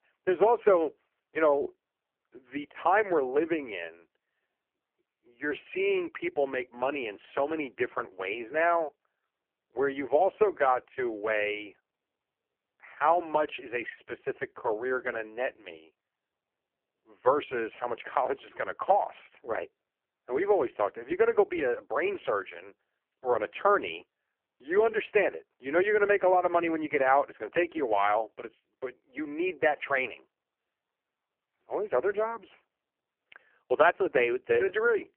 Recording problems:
phone-call audio; poor line

